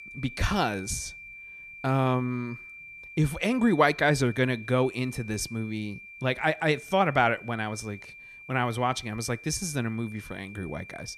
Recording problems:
high-pitched whine; noticeable; throughout; 2.5 kHz, 15 dB below the speech

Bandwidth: 14.5 kHz